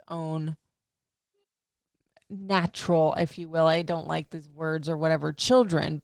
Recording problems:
garbled, watery; slightly; nothing above 19 kHz

